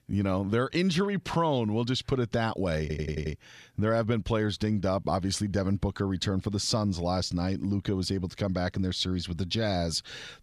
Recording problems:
audio stuttering; at 3 s

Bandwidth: 15 kHz